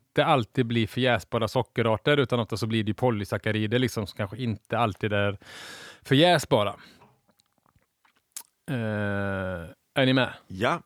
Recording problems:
none

